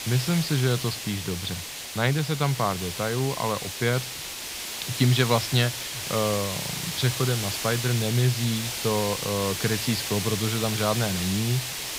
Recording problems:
high frequencies cut off; noticeable; nothing above 5.5 kHz
hiss; loud; throughout; 4 dB below the speech

